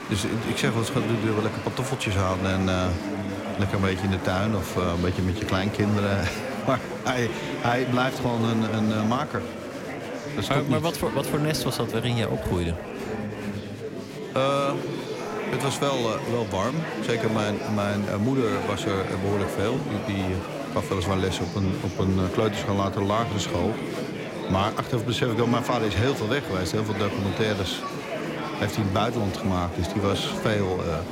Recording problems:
murmuring crowd; loud; throughout; 5 dB below the speech
door banging; faint; at 13 s; peak 15 dB below the speech

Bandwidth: 16 kHz